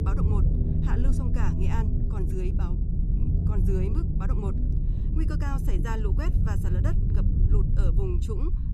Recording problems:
low rumble; loud; throughout; 1 dB below the speech

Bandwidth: 14.5 kHz